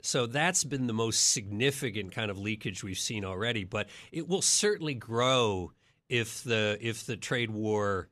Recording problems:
none

